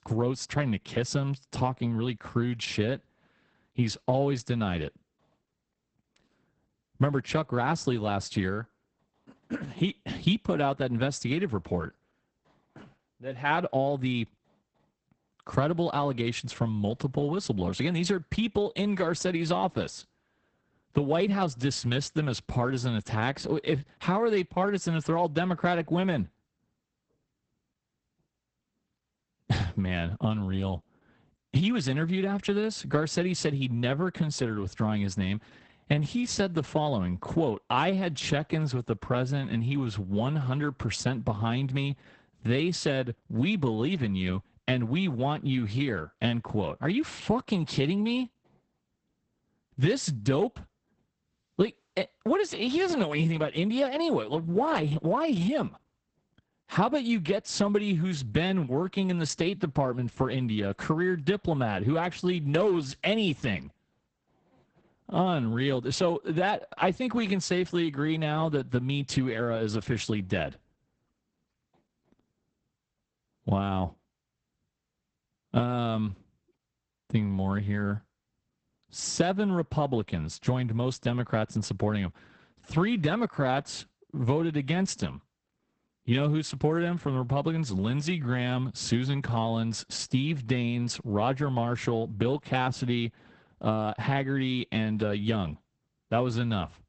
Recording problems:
garbled, watery; badly; nothing above 8 kHz

